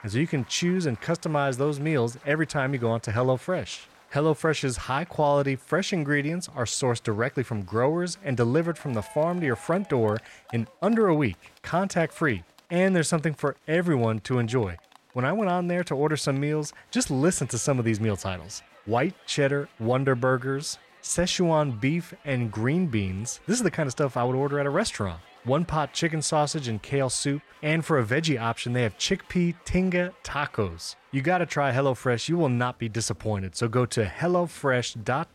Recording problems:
crowd noise; faint; throughout; 25 dB below the speech

